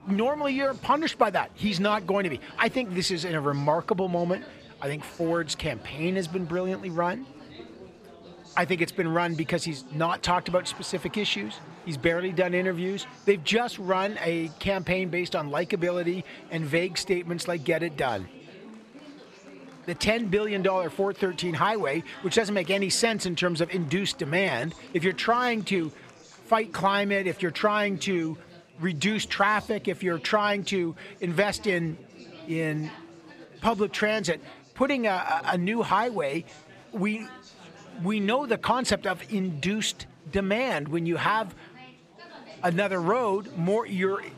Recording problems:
chatter from many people; faint; throughout; 20 dB below the speech

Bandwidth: 15 kHz